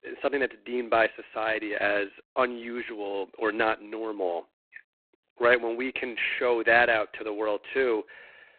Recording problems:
phone-call audio; poor line; nothing above 4 kHz
thin; very; fading below 300 Hz

